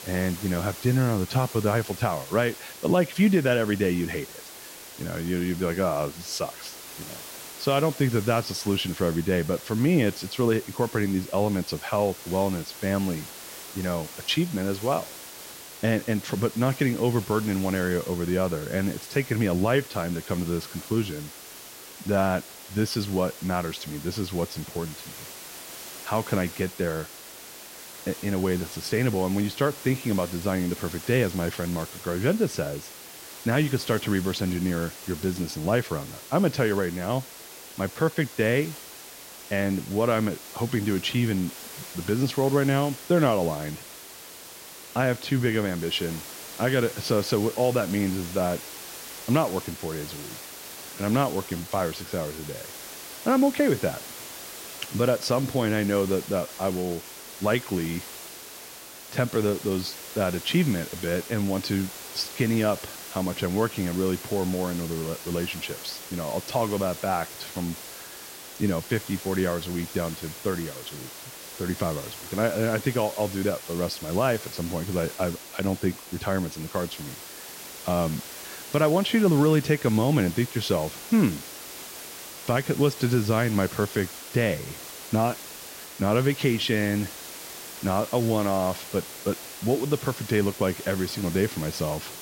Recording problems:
hiss; noticeable; throughout; 10 dB below the speech

